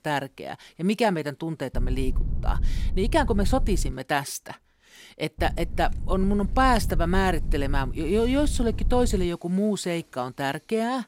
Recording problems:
low rumble; faint; from 1.5 to 4 s and from 5.5 to 9.5 s; 20 dB below the speech

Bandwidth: 16 kHz